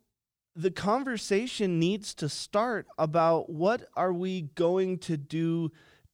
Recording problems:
none

